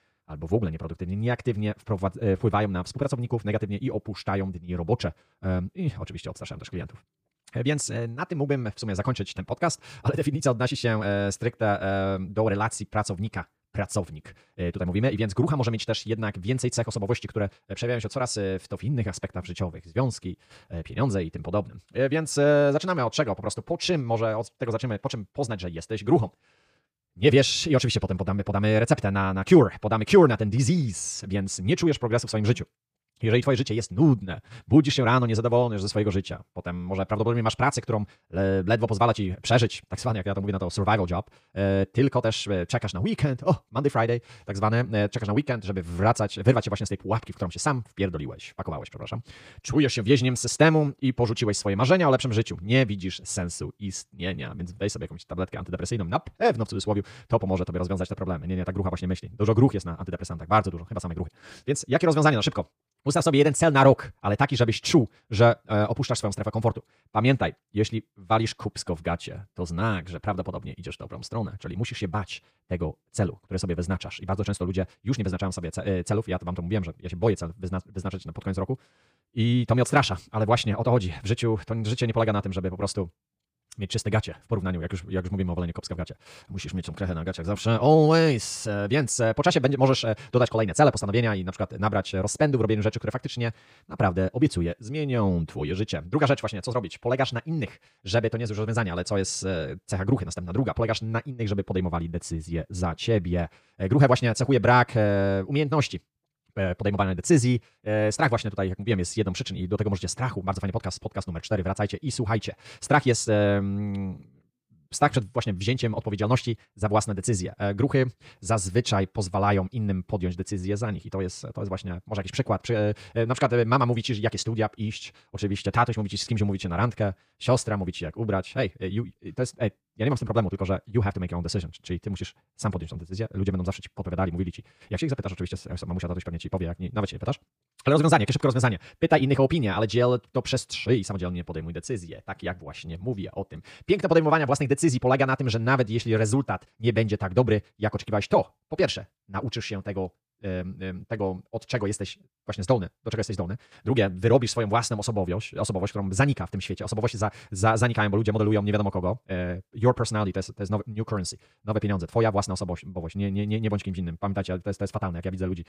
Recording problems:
wrong speed, natural pitch; too fast; 1.7 times normal speed

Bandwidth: 15 kHz